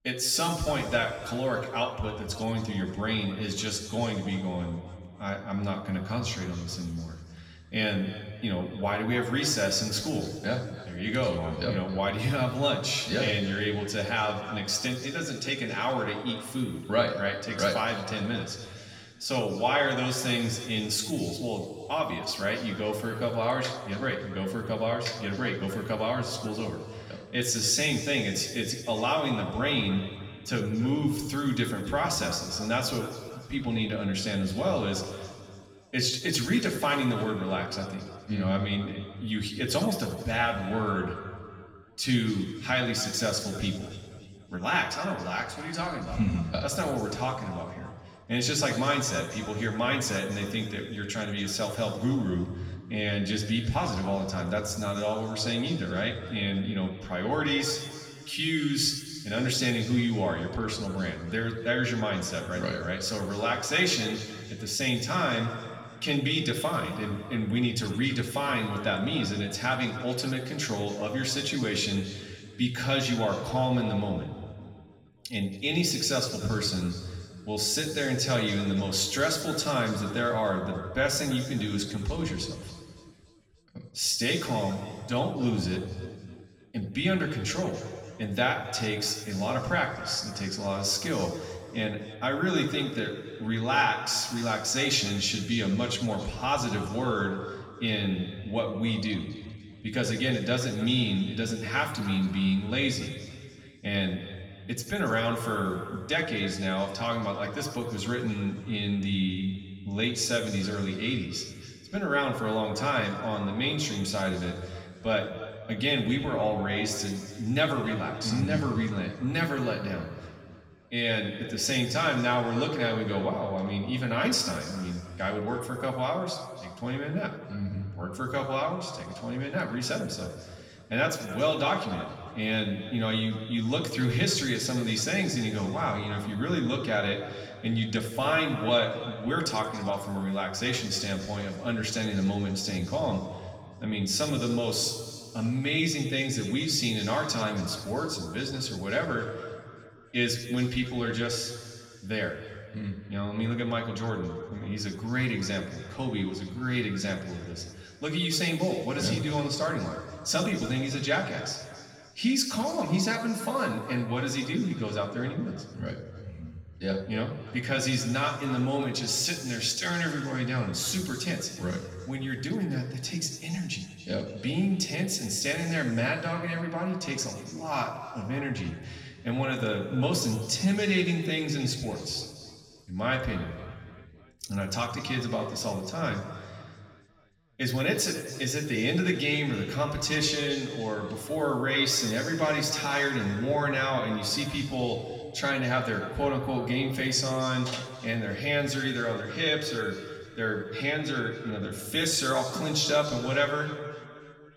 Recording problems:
off-mic speech; far
room echo; noticeable; dies away in 2.1 s

